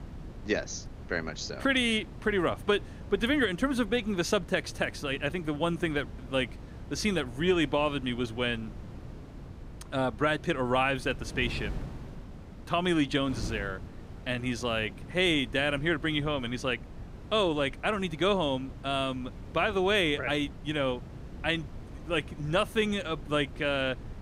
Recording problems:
wind noise on the microphone; occasional gusts; 20 dB below the speech

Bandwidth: 15.5 kHz